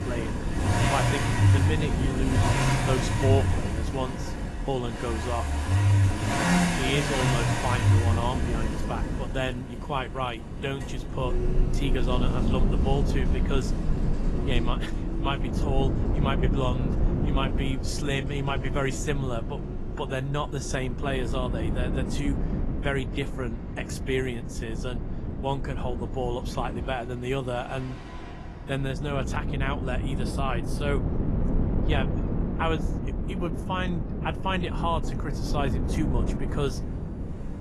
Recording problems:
garbled, watery; slightly; nothing above 12 kHz
traffic noise; very loud; throughout; 3 dB above the speech
wind noise on the microphone; heavy; 7 dB below the speech

